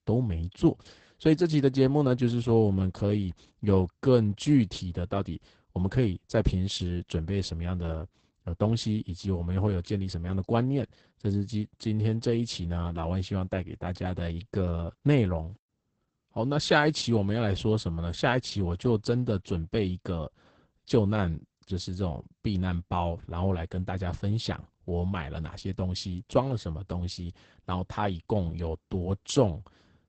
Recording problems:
garbled, watery; badly; nothing above 8 kHz

